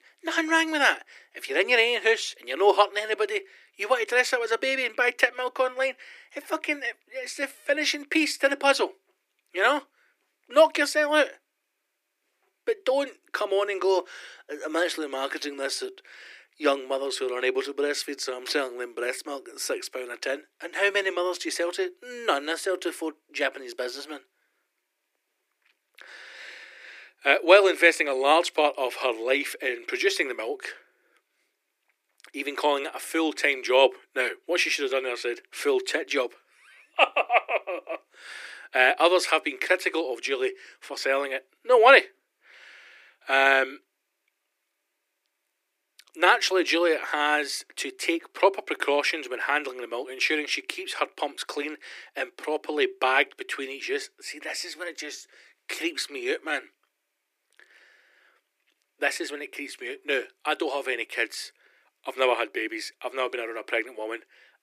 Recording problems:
thin; somewhat; fading below 300 Hz

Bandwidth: 15 kHz